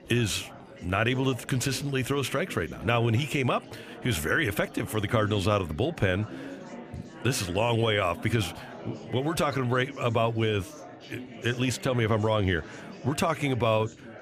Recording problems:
chatter from many people; noticeable; throughout; 15 dB below the speech

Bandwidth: 15 kHz